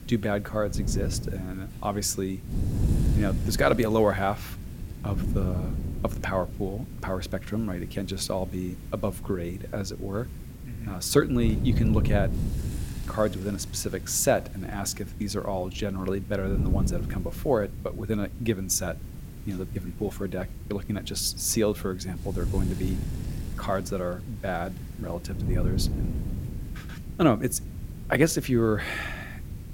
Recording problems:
wind noise on the microphone; occasional gusts; 15 dB below the speech
hiss; faint; throughout; 25 dB below the speech

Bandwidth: 16.5 kHz